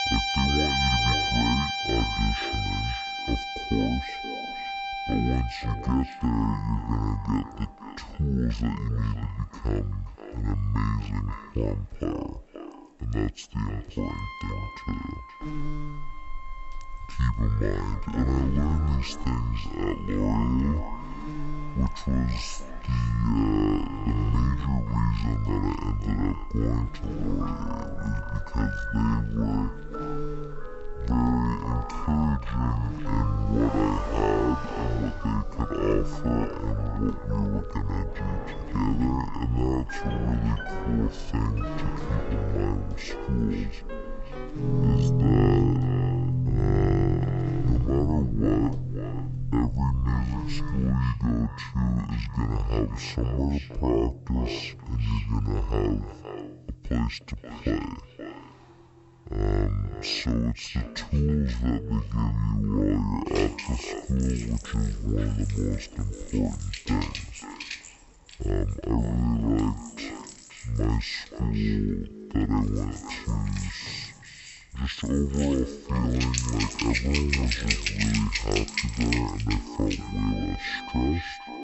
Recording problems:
wrong speed and pitch; too slow and too low; 0.5 times normal speed
echo of what is said; noticeable; throughout; 530 ms later, 15 dB below the speech
background music; loud; throughout; 4 dB below the speech
traffic noise; faint; throughout; 30 dB below the speech
electrical hum; very faint; from 15 to 51 s; 60 Hz, 10 dB below the speech

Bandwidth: 8 kHz